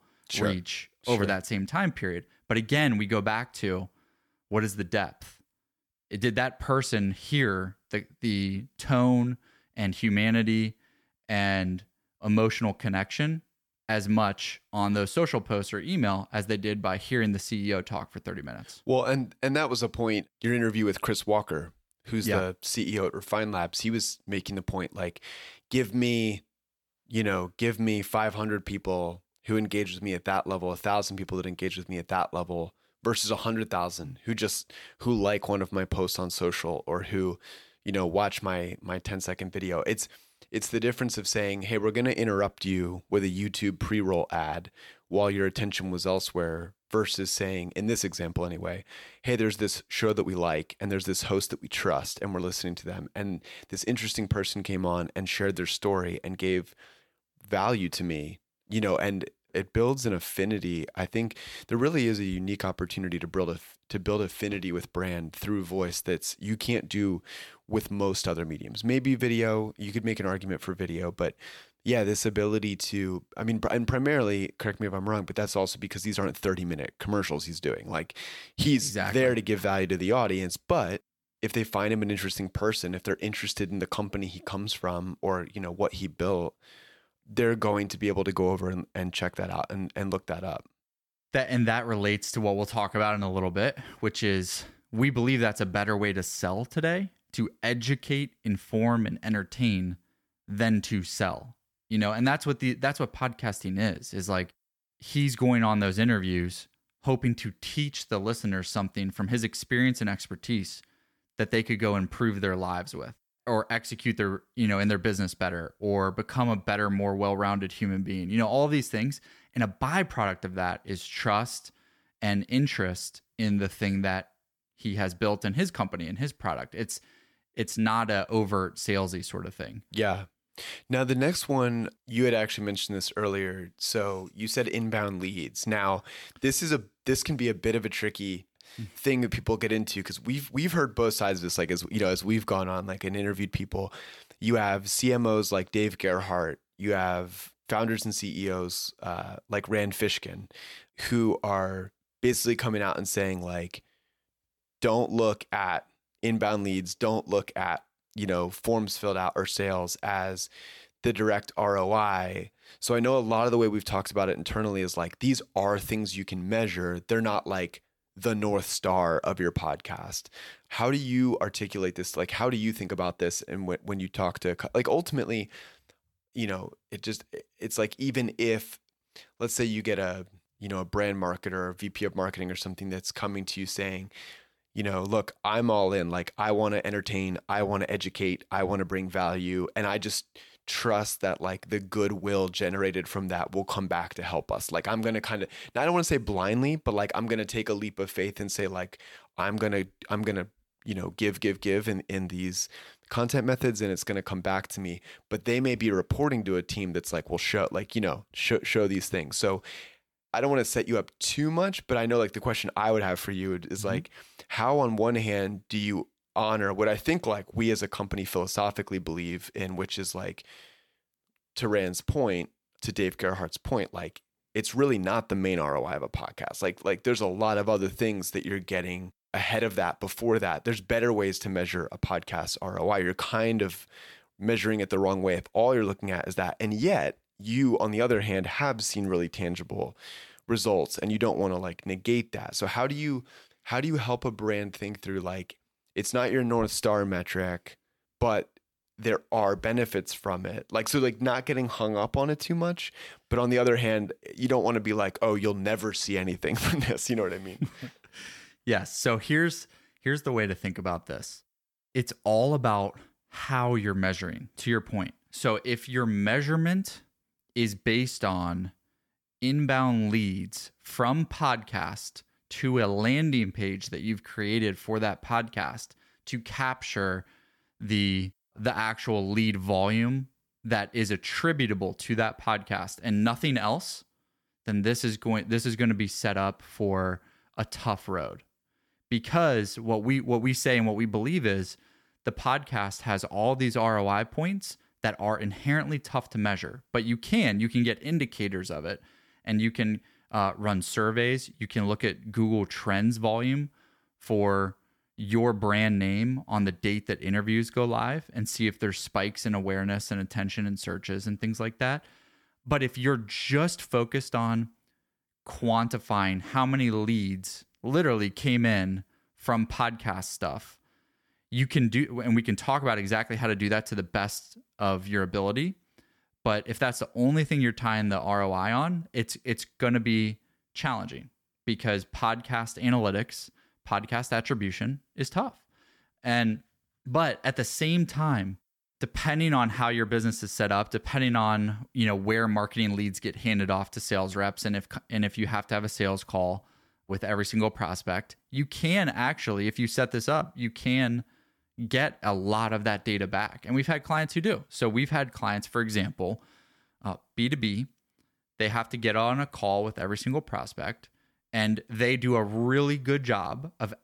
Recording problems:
none

